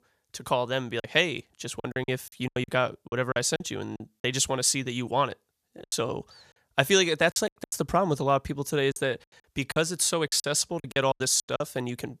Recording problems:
choppy; very; from 1 to 4 s, from 6 to 7.5 s and from 9 to 12 s; 16% of the speech affected

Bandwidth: 14.5 kHz